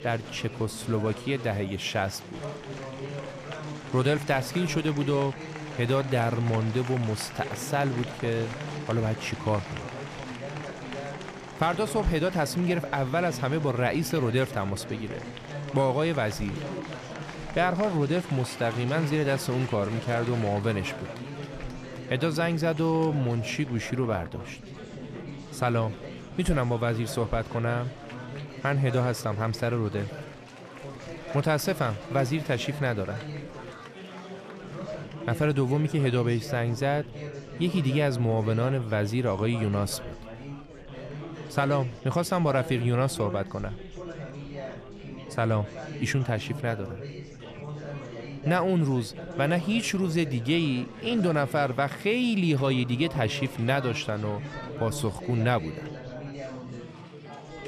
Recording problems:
chatter from many people; noticeable; throughout; 10 dB below the speech

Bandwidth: 14.5 kHz